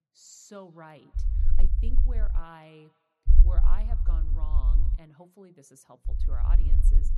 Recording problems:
echo of what is said; faint; throughout; 180 ms later, 25 dB below the speech
low rumble; loud; from 1 to 2.5 s, from 3.5 to 5 s and from 6 s on; 3 dB below the speech

